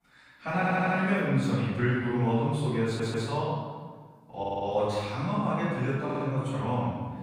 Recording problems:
room echo; strong; dies away in 1.4 s
off-mic speech; far
audio stuttering; 4 times, first at 0.5 s

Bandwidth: 15 kHz